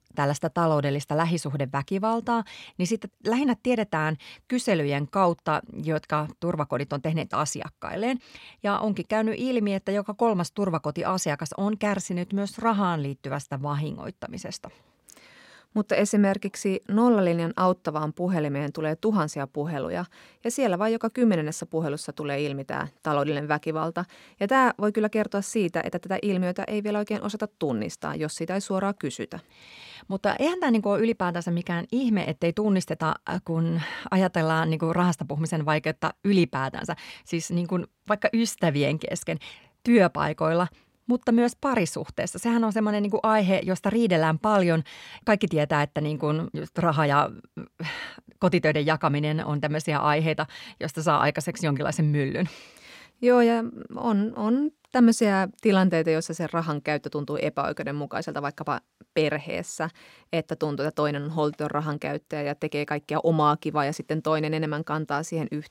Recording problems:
none

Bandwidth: 16 kHz